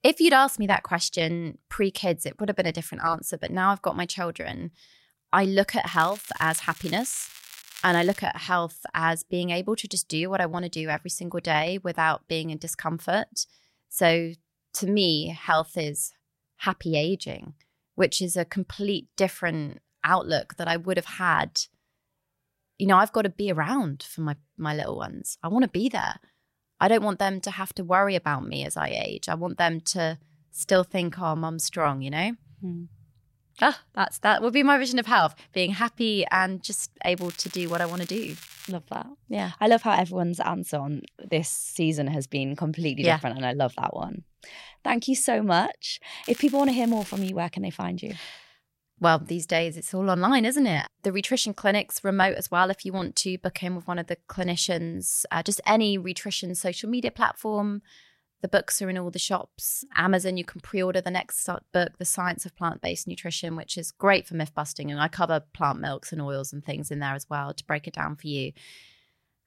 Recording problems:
crackling; noticeable; from 6 to 8 s, from 37 to 39 s and from 46 to 47 s; 15 dB below the speech

